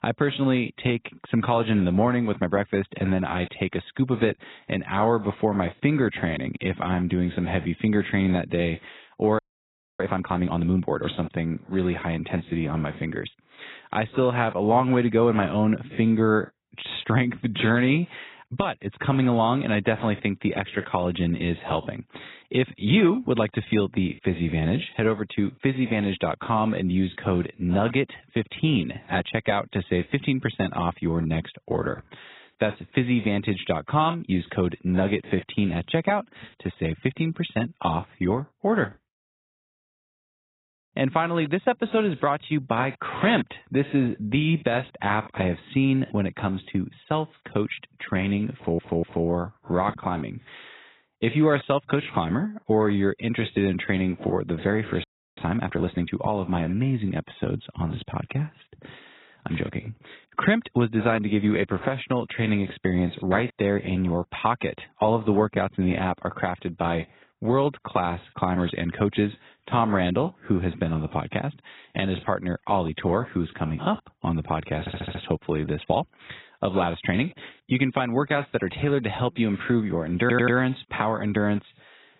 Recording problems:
garbled, watery; badly; nothing above 4 kHz
audio freezing; at 9.5 s for 0.5 s and at 55 s
audio stuttering; at 49 s, at 1:15 and at 1:20

